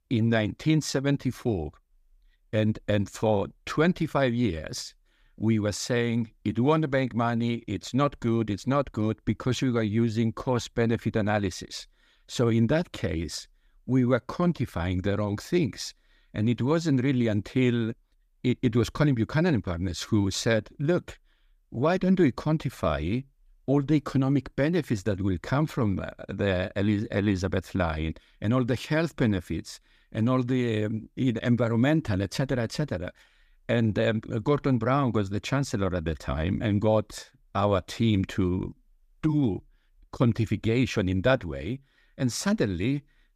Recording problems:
none

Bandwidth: 15 kHz